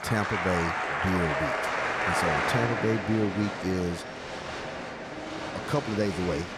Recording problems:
crowd noise; loud; throughout; as loud as the speech
rain or running water; noticeable; throughout; 20 dB below the speech

